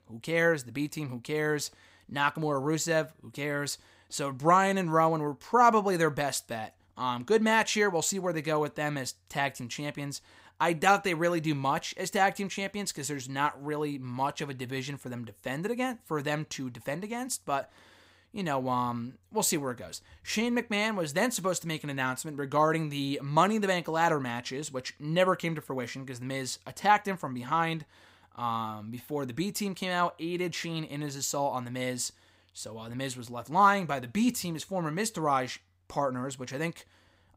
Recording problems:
none

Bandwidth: 15.5 kHz